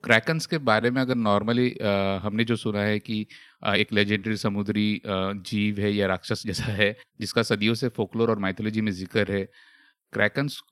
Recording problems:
uneven, jittery; strongly; from 0.5 to 9.5 s

